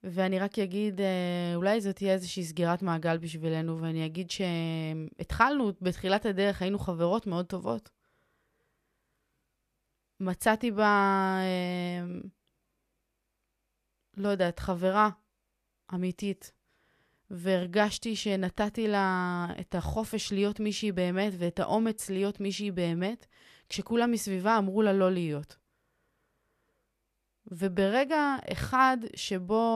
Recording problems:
abrupt cut into speech; at the end

